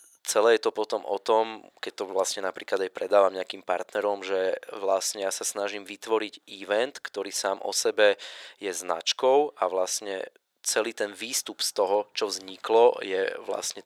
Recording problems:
thin; somewhat; fading below 550 Hz

